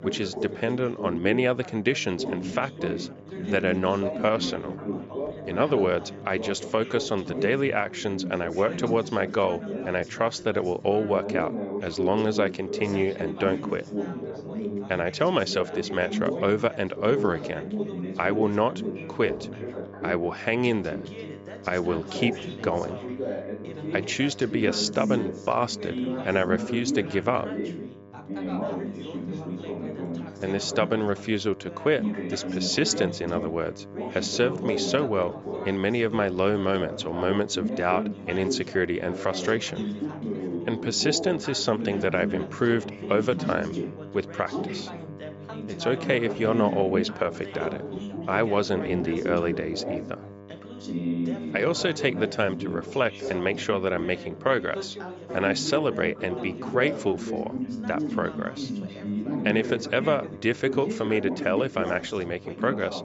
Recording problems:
high frequencies cut off; noticeable; nothing above 8 kHz
background chatter; loud; throughout; 3 voices, 6 dB below the speech
electrical hum; faint; throughout; 50 Hz, 20 dB below the speech

